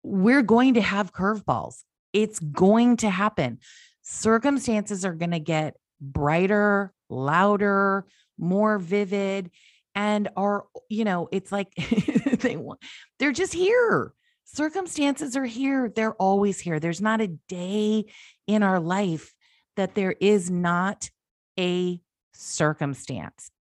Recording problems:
none

